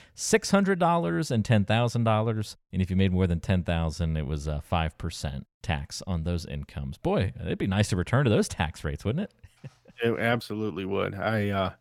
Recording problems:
none

